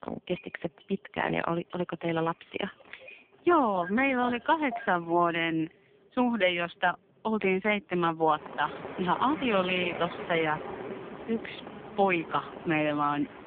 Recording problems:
phone-call audio; poor line
traffic noise; noticeable; throughout; 10 dB below the speech

